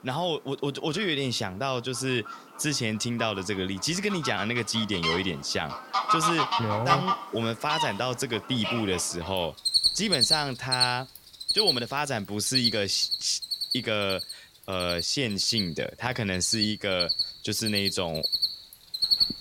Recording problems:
animal sounds; very loud; throughout; 1 dB above the speech

